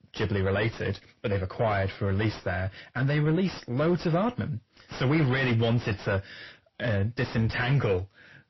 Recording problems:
distortion; heavy; 7 dB below the speech
garbled, watery; slightly; nothing above 5.5 kHz

